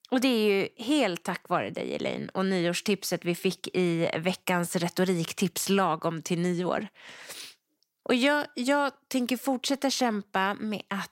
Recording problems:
none

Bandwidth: 16 kHz